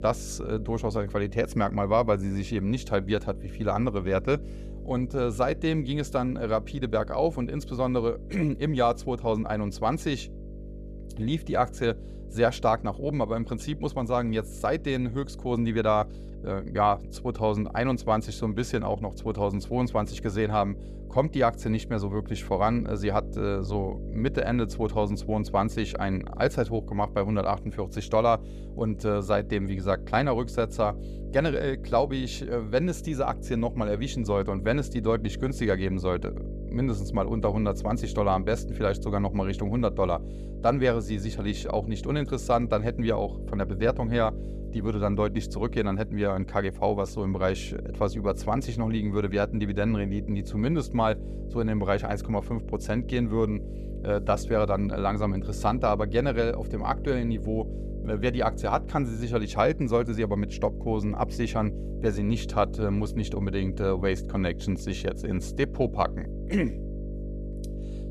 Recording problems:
electrical hum; noticeable; throughout; 50 Hz, 15 dB below the speech

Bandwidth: 14.5 kHz